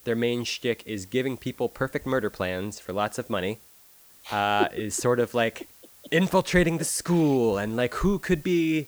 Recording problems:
hiss; faint; throughout; 25 dB below the speech

